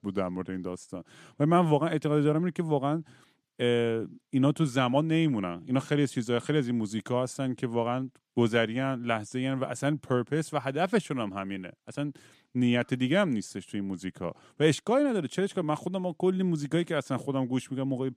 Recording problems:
none

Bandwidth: 14.5 kHz